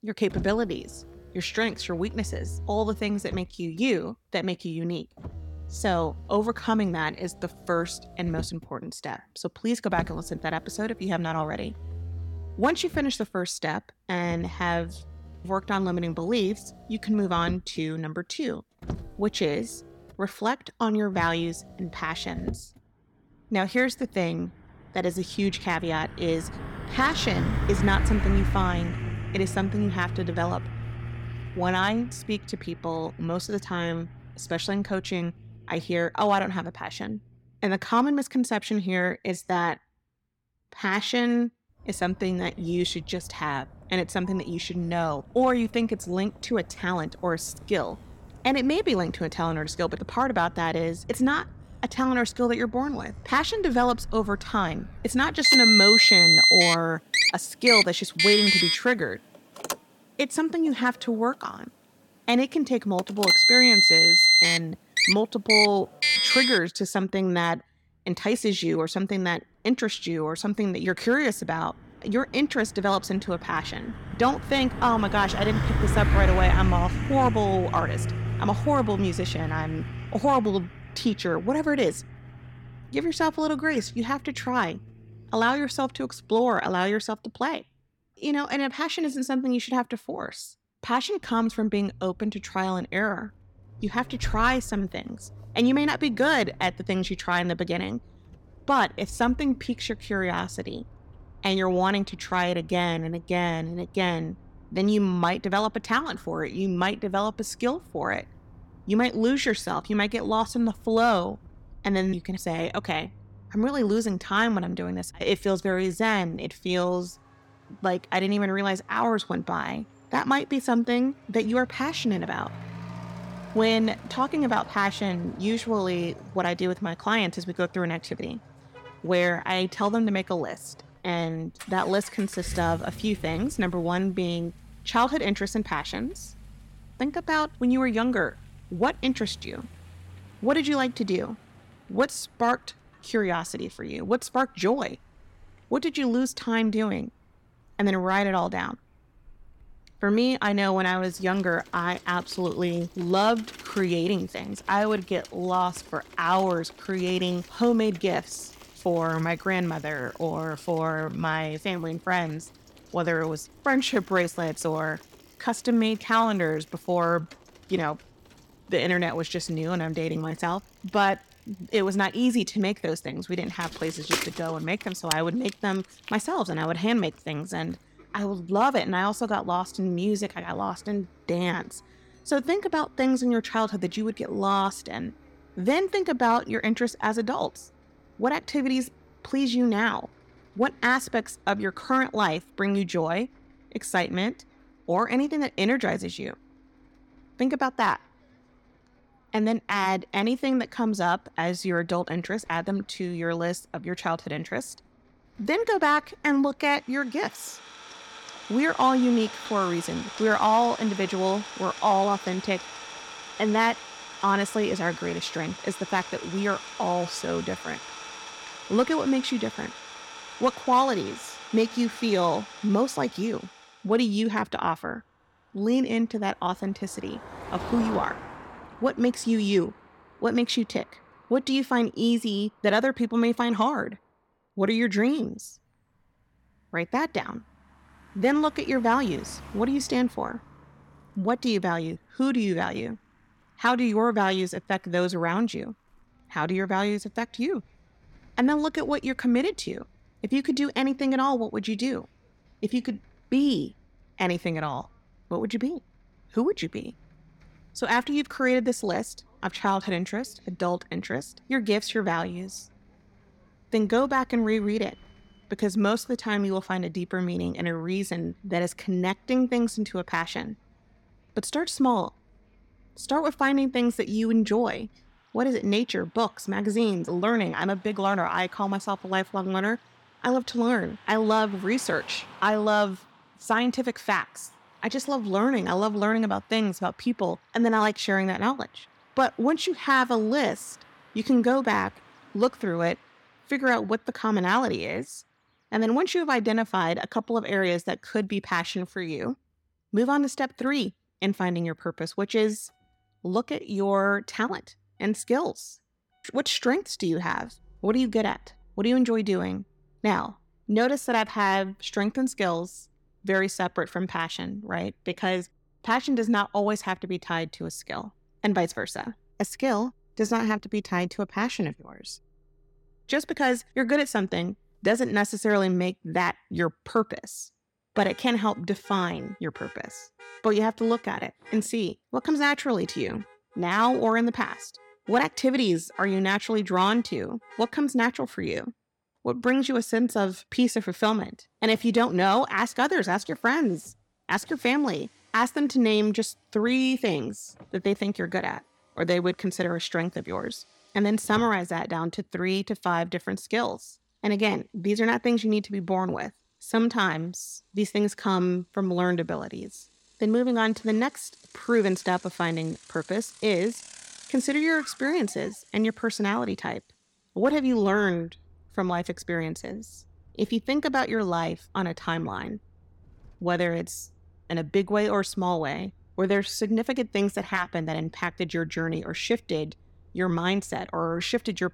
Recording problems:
traffic noise; very loud; throughout; 1 dB above the speech

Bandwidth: 17 kHz